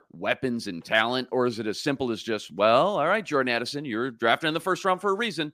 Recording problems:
none

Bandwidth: 15 kHz